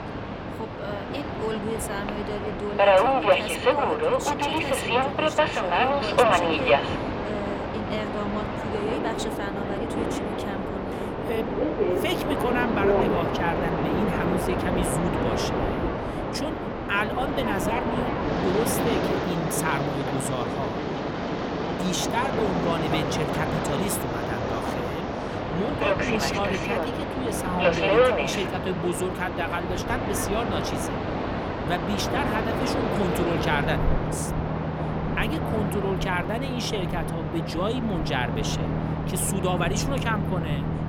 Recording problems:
train or aircraft noise; very loud; throughout; 4 dB above the speech

